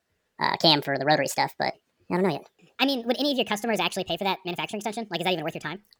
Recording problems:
wrong speed and pitch; too fast and too high; 1.5 times normal speed

